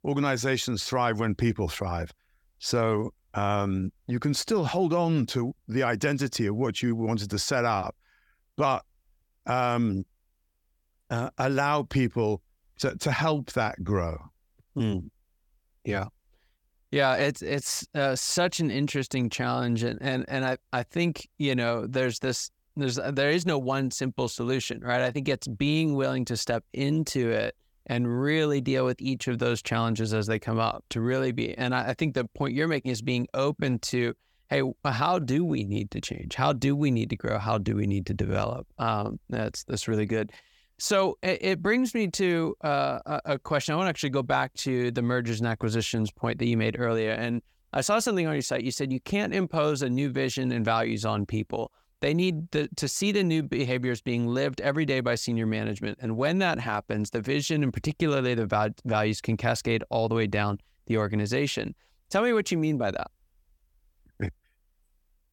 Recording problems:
none

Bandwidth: 18 kHz